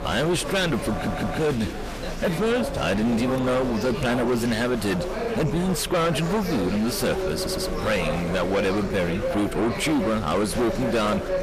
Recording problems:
distortion; heavy; 6 dB below the speech
chatter from many people; loud; throughout; 5 dB below the speech
audio stuttering; at 1 s and at 7.5 s

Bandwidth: 14.5 kHz